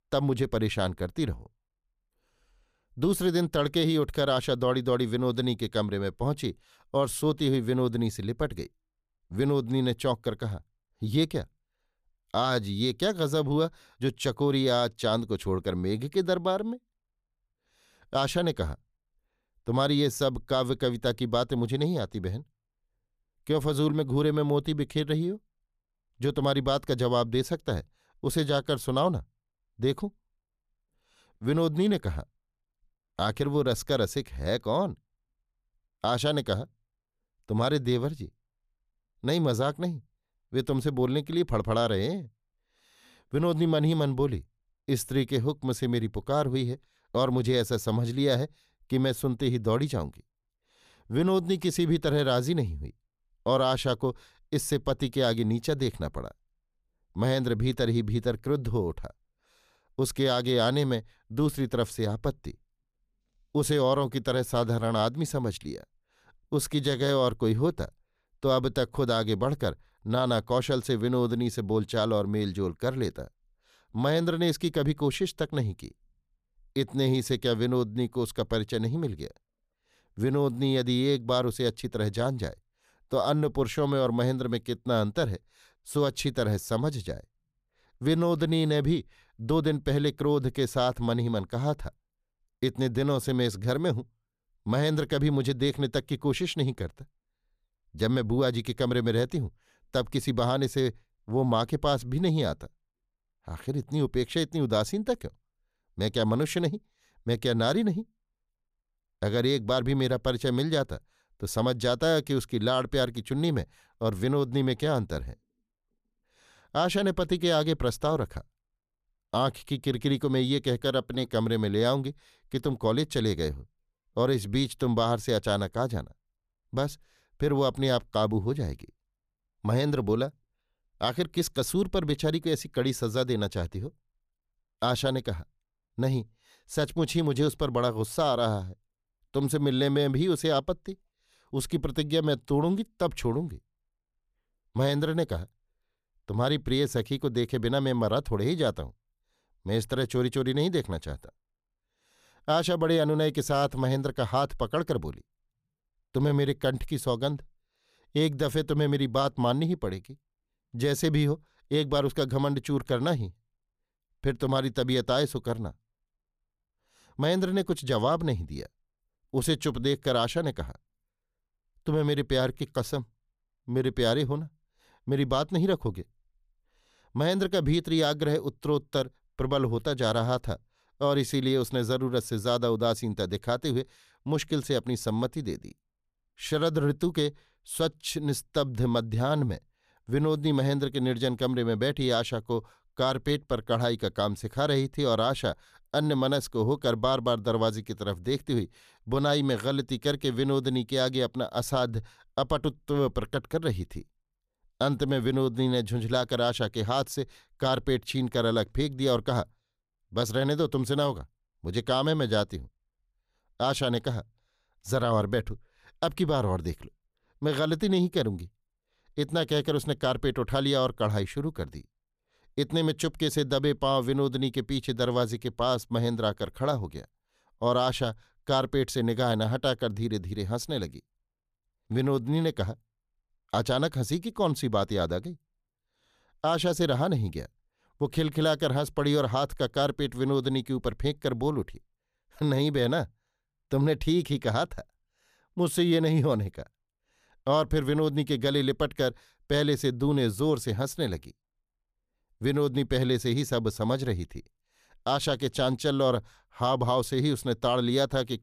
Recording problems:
none

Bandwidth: 14.5 kHz